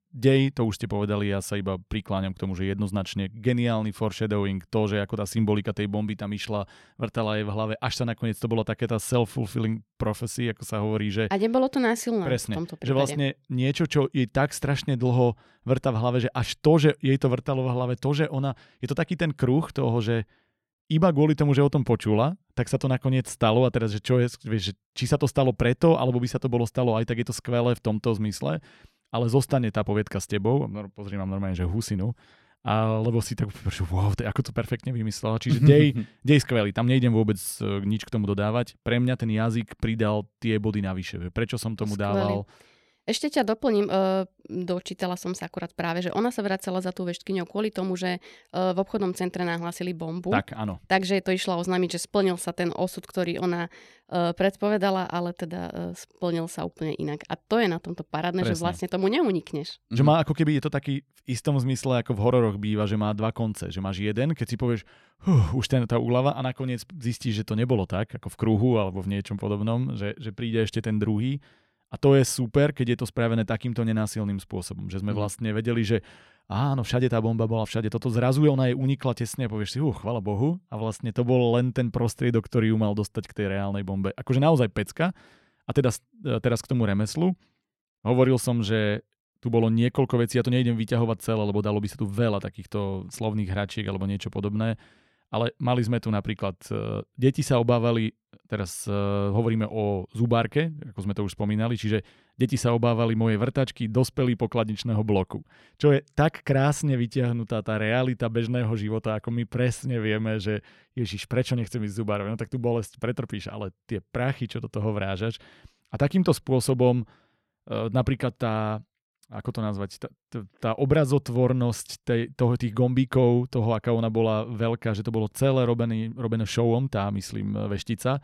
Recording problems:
none

